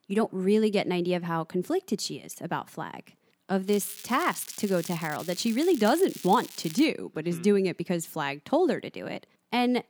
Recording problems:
crackling; noticeable; from 3.5 to 7 s; 15 dB below the speech

